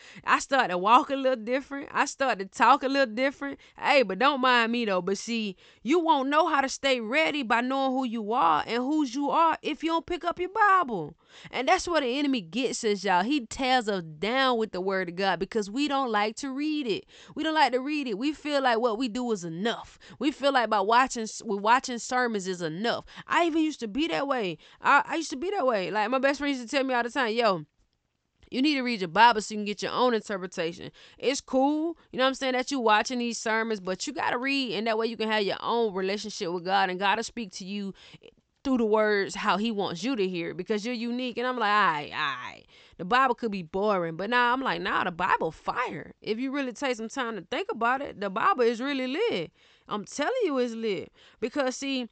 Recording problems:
high frequencies cut off; noticeable; nothing above 8 kHz

